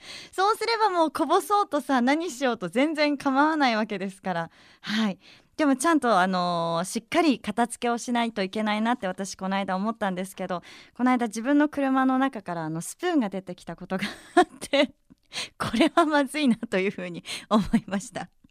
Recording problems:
none

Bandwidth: 14.5 kHz